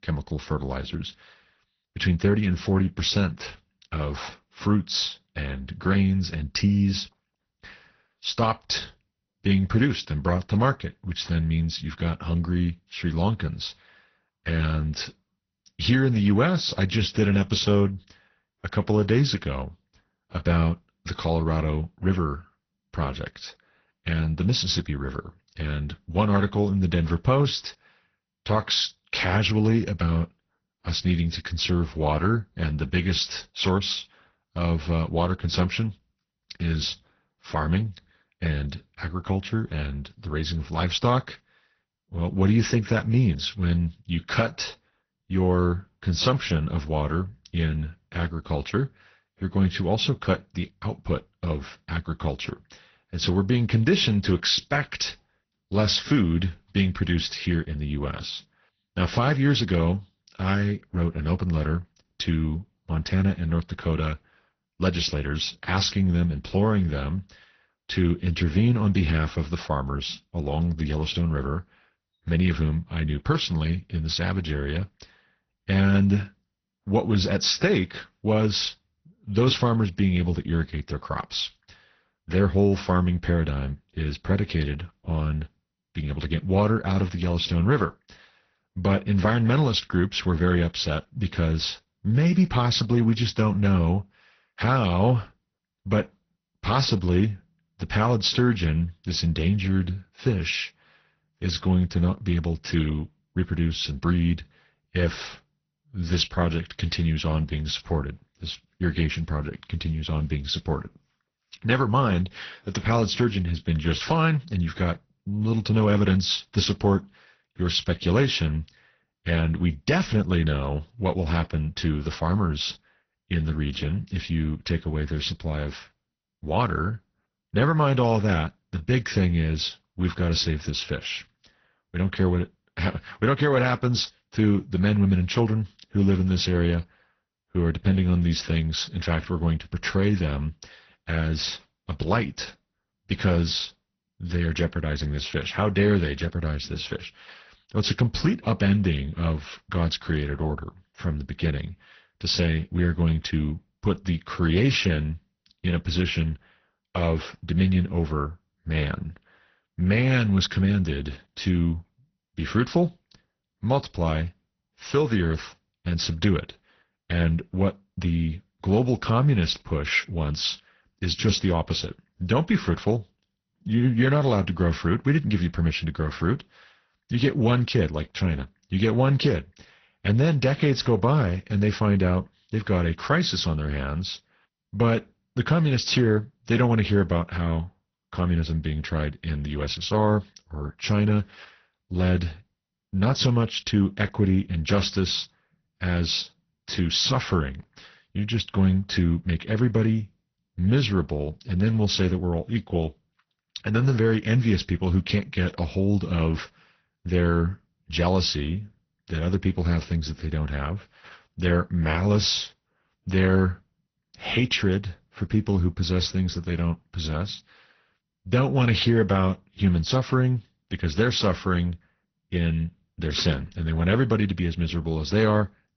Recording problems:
garbled, watery; slightly; nothing above 6 kHz

